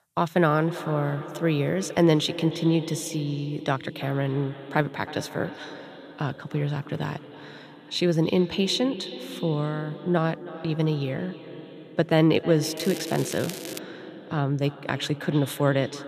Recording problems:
echo of what is said; noticeable; throughout; 320 ms later, 15 dB below the speech
crackling; noticeable; from 13 to 14 s; 10 dB below the speech

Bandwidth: 14.5 kHz